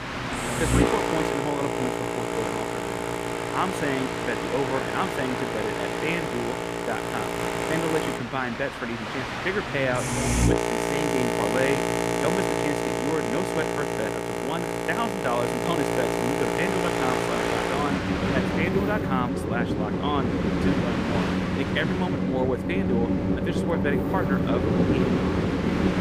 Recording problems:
train or aircraft noise; very loud; throughout; 4 dB above the speech

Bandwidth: 15 kHz